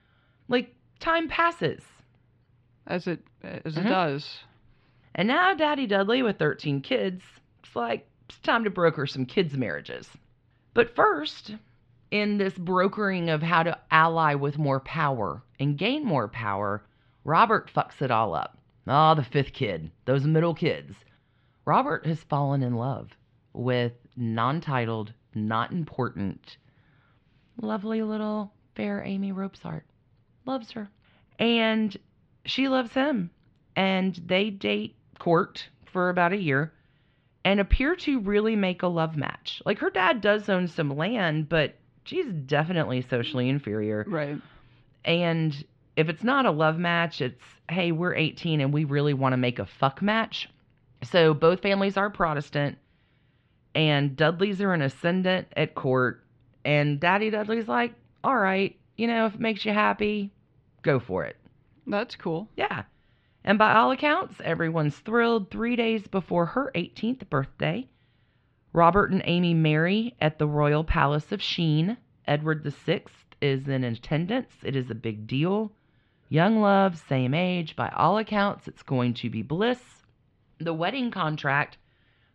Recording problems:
muffled; slightly; fading above 3.5 kHz

